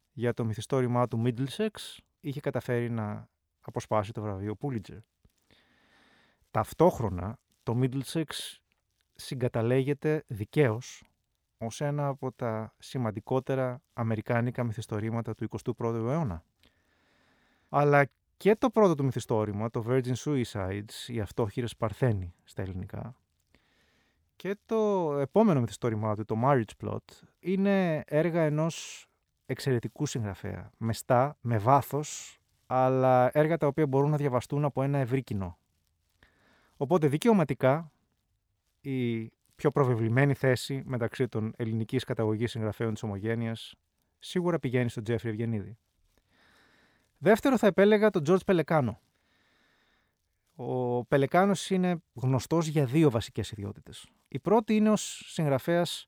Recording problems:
none

